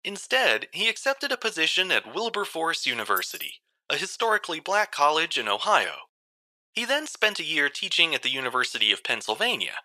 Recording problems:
thin; very; fading below 700 Hz
jangling keys; faint; at 3 s; peak 10 dB below the speech

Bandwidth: 14.5 kHz